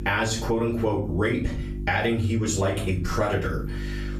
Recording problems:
off-mic speech; far
room echo; slight; dies away in 0.3 s
squashed, flat; somewhat
electrical hum; noticeable; throughout; 50 Hz, 20 dB below the speech

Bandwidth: 14.5 kHz